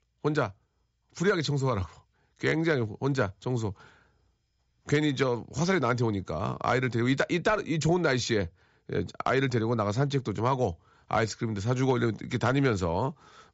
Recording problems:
high frequencies cut off; noticeable; nothing above 8 kHz

